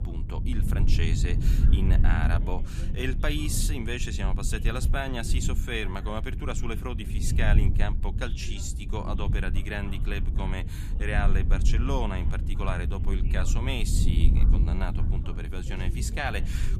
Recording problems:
low rumble; loud; throughout; 9 dB below the speech
voice in the background; noticeable; throughout; 20 dB below the speech

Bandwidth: 14 kHz